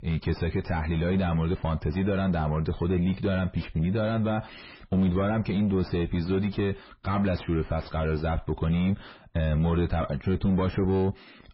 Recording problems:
distortion; heavy; 4 dB below the speech
garbled, watery; badly; nothing above 5.5 kHz

